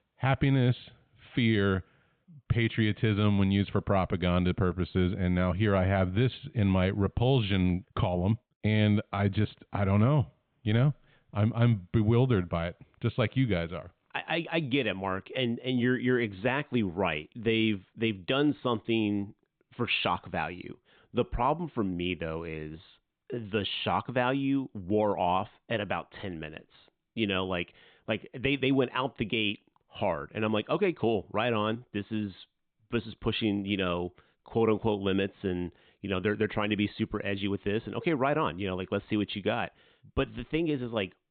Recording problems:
high frequencies cut off; severe; nothing above 4 kHz

